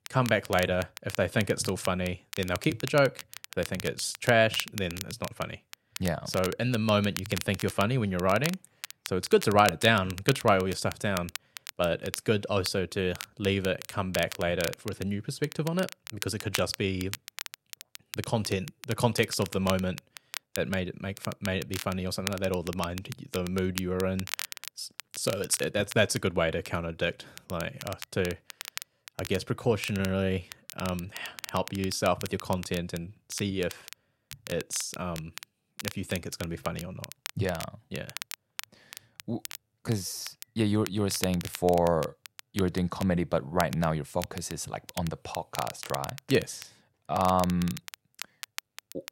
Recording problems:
crackle, like an old record; noticeable; 10 dB below the speech

